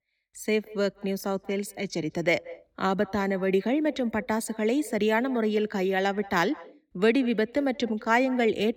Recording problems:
echo of what is said; faint; throughout; 180 ms later, 20 dB below the speech

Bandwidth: 17 kHz